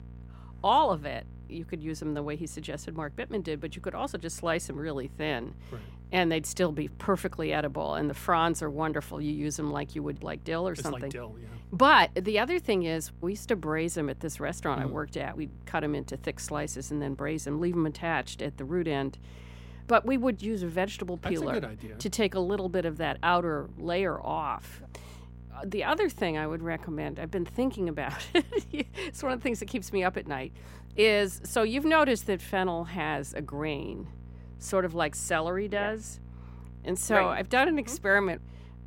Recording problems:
electrical hum; faint; throughout; 60 Hz, 30 dB below the speech

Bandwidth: 16 kHz